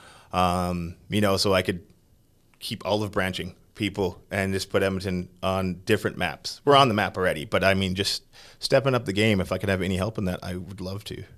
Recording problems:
none

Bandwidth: 14.5 kHz